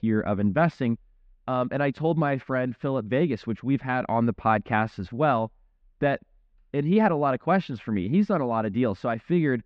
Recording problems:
muffled; slightly; fading above 3 kHz

